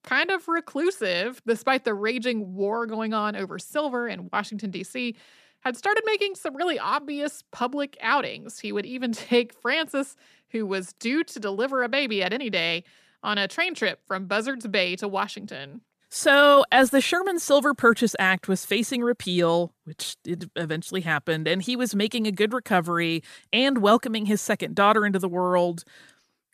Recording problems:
none

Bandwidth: 14.5 kHz